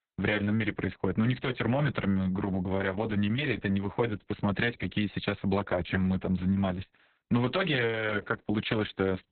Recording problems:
garbled, watery; badly; nothing above 4 kHz

